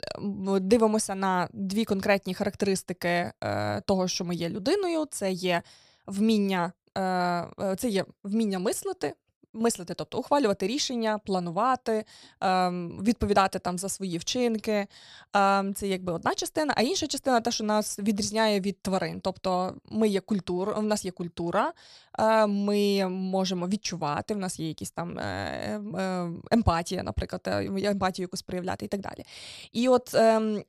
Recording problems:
none

